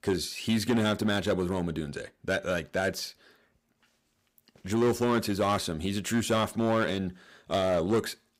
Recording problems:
distortion; slight; 5% of the sound clipped

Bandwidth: 15.5 kHz